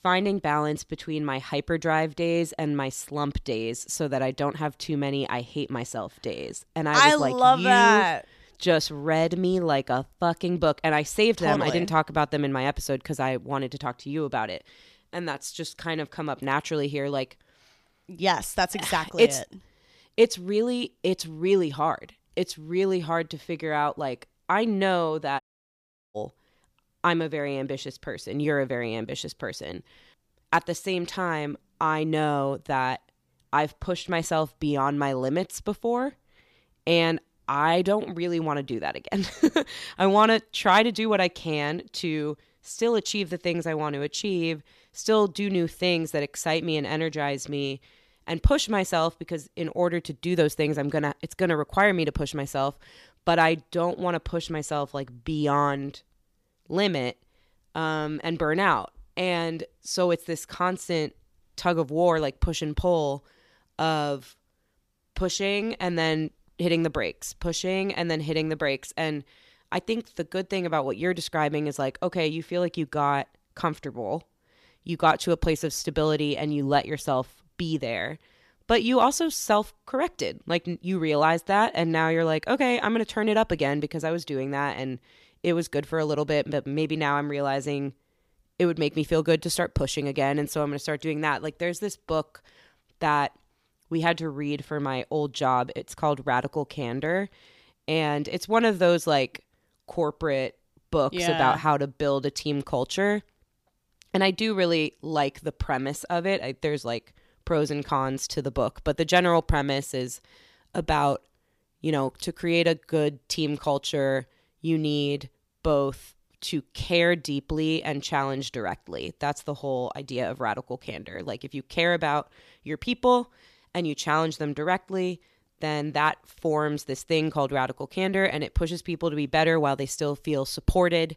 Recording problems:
audio cutting out; at 25 s for 0.5 s

